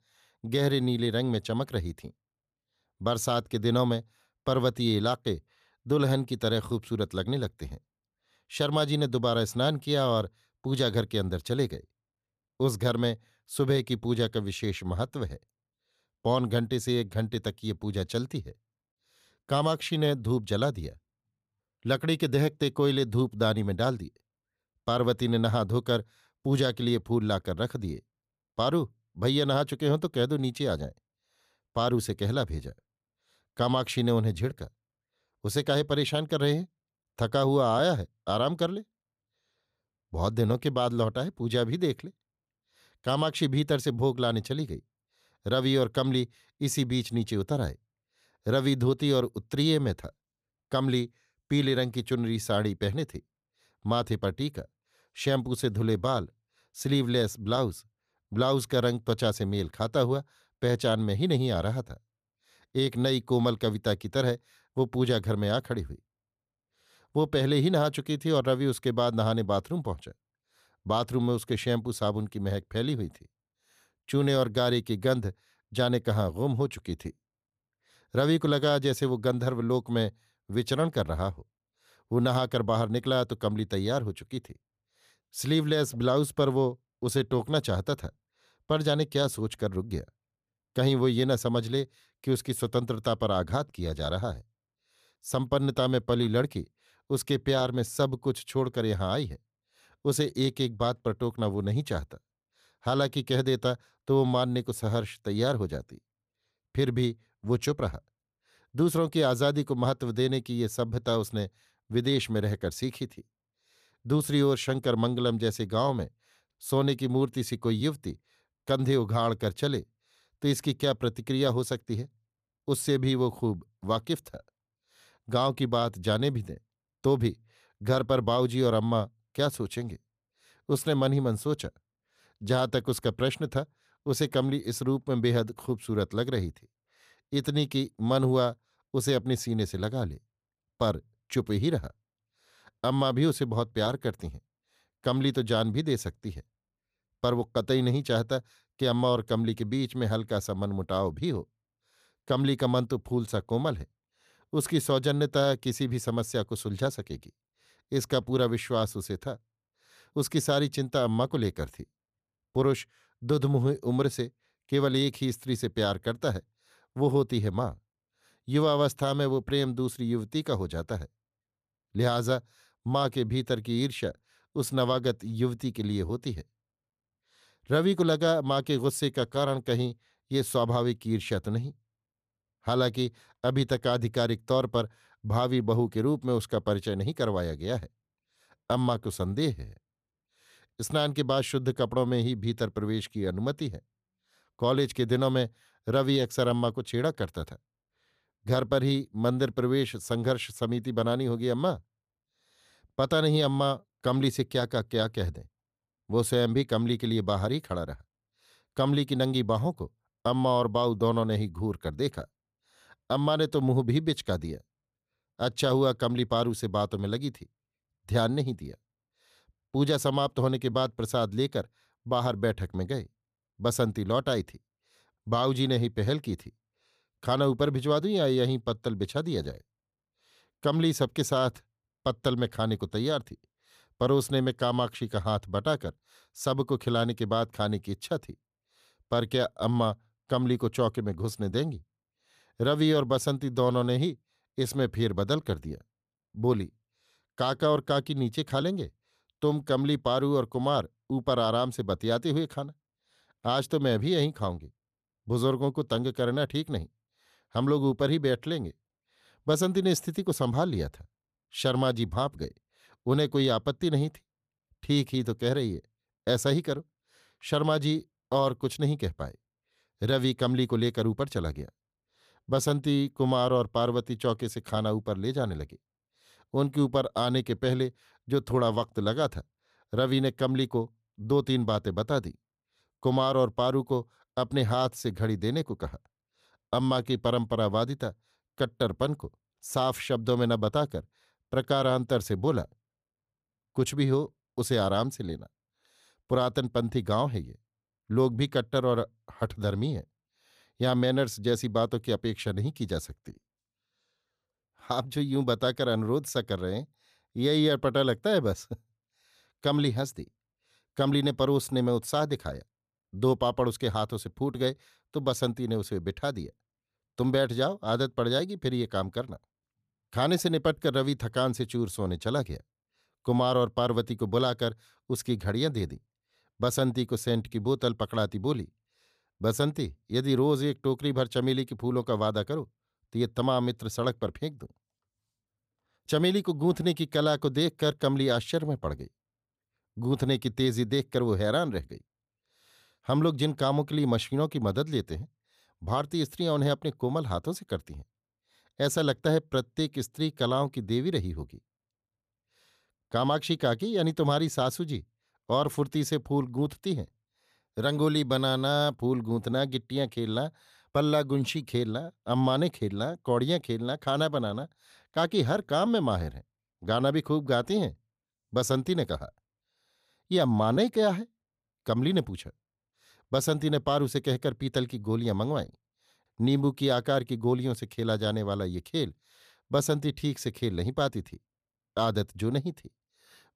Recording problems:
none

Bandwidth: 14.5 kHz